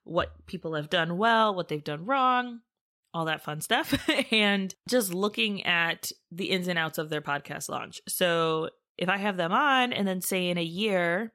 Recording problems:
none

